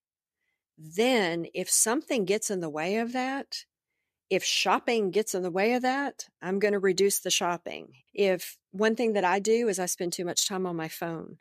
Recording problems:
none

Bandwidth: 14.5 kHz